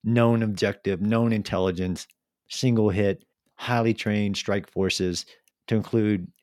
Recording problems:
none

